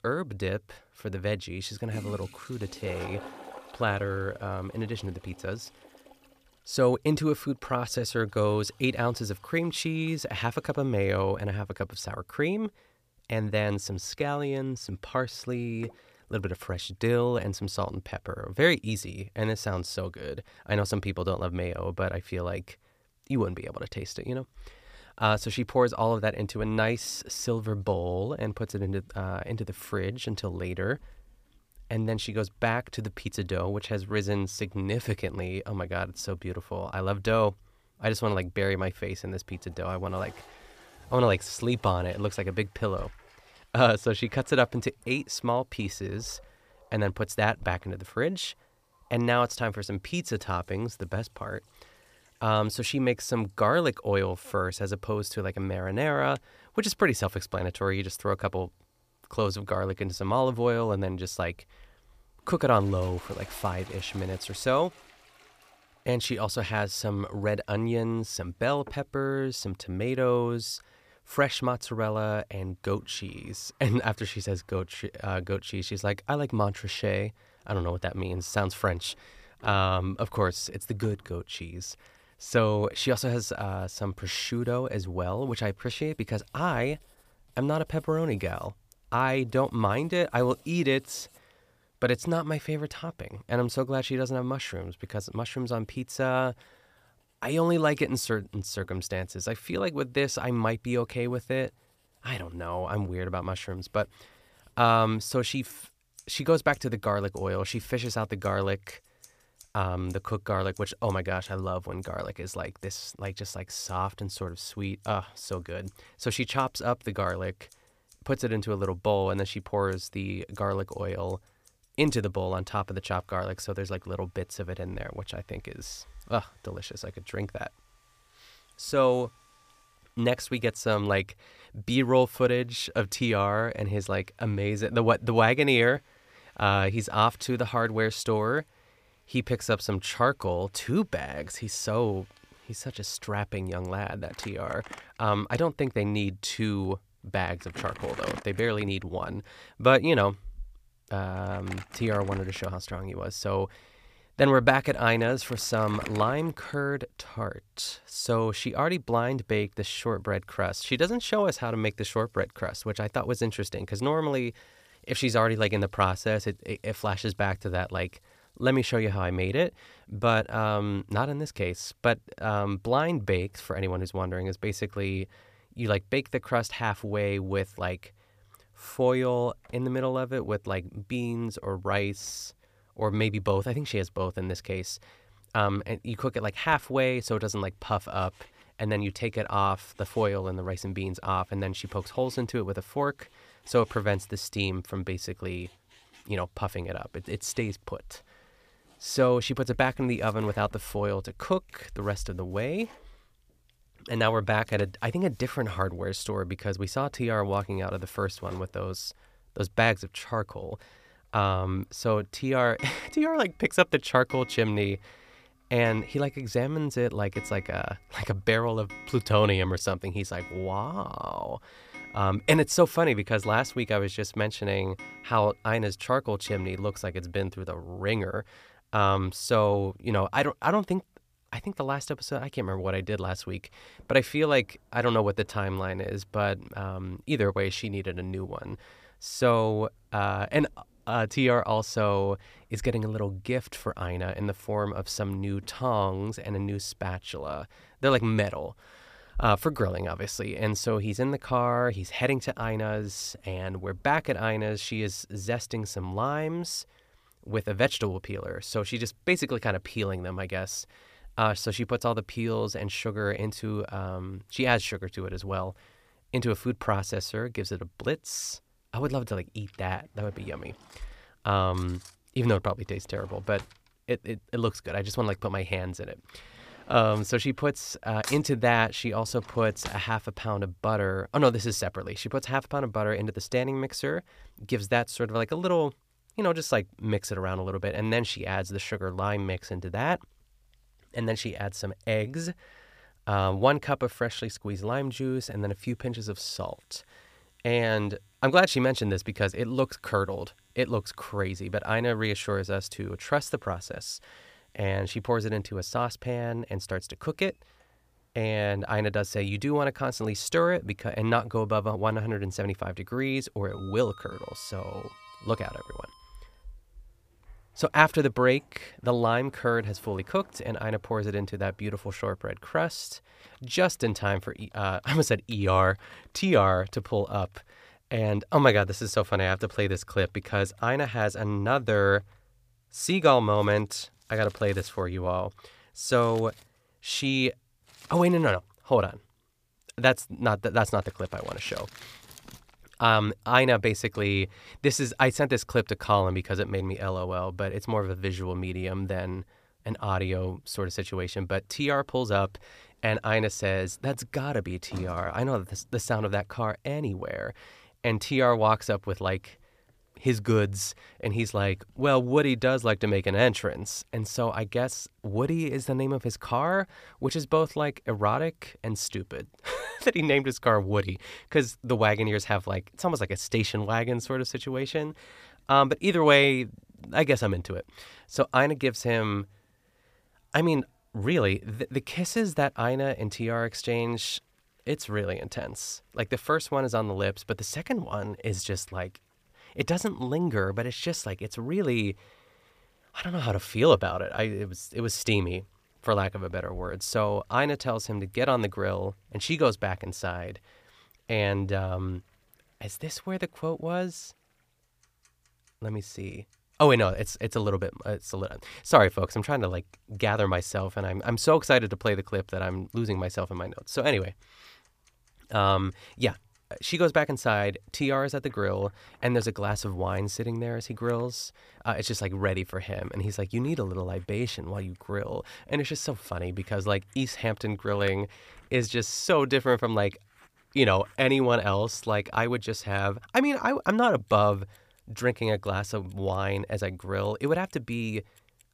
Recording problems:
household noises; faint; throughout; 25 dB below the speech

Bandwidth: 15 kHz